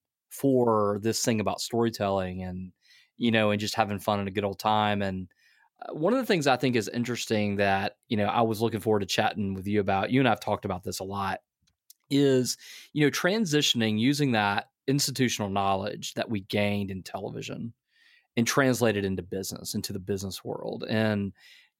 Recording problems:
none

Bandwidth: 16.5 kHz